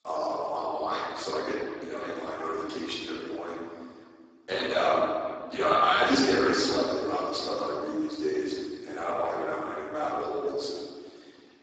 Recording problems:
room echo; strong; dies away in 1.8 s
off-mic speech; far
garbled, watery; badly; nothing above 7.5 kHz
thin; very slightly; fading below 250 Hz

